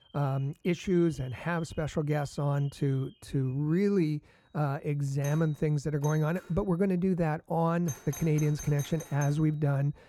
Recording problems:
muffled; slightly; fading above 2.5 kHz
alarms or sirens; noticeable; throughout; 20 dB below the speech

